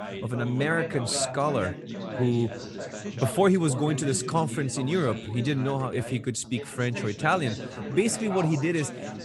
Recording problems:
background chatter; loud; throughout; 4 voices, 9 dB below the speech

